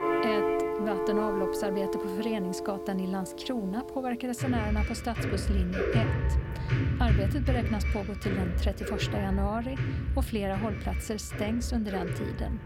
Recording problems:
background music; very loud; throughout; 2 dB above the speech

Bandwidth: 16.5 kHz